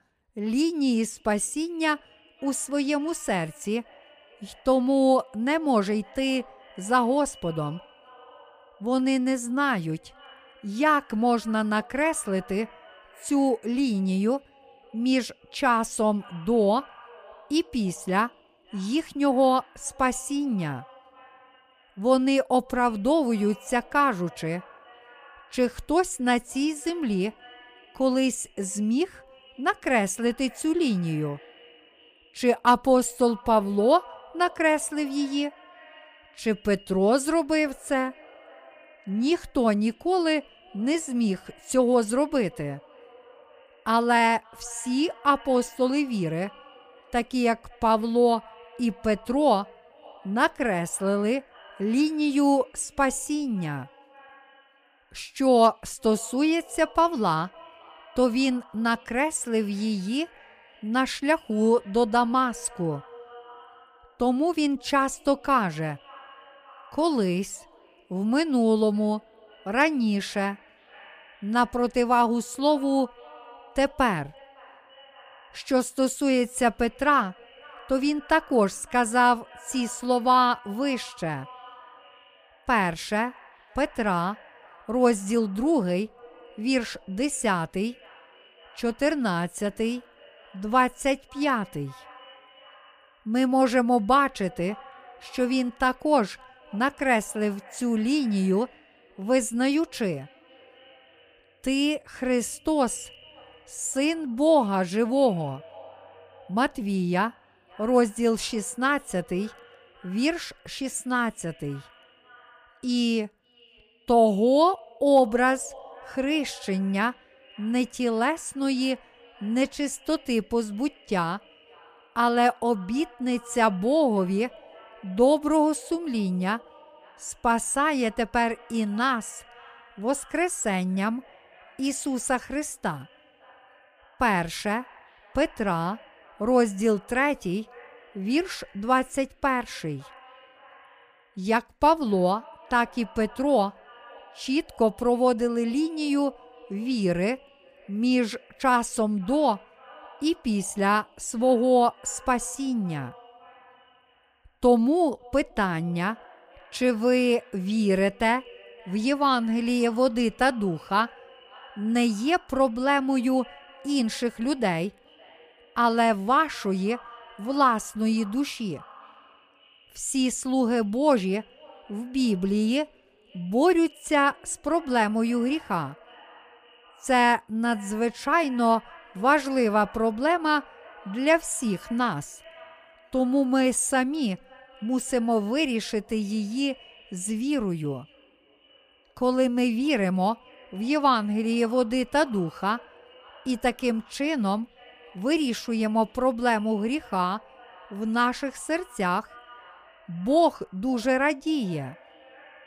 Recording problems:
echo of what is said; faint; throughout; 560 ms later, 25 dB below the speech

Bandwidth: 15 kHz